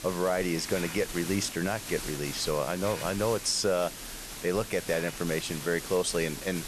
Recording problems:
hiss; loud; throughout; 8 dB below the speech

